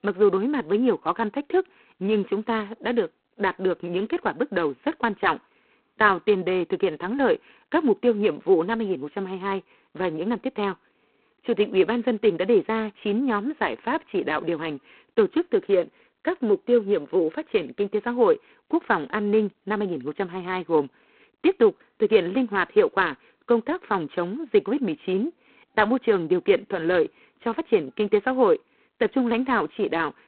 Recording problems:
phone-call audio; poor line; nothing above 4 kHz

